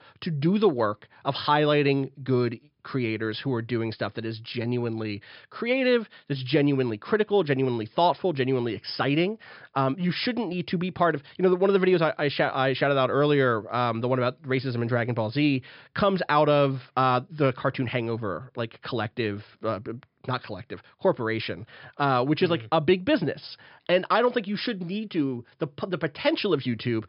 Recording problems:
high frequencies cut off; noticeable; nothing above 5.5 kHz

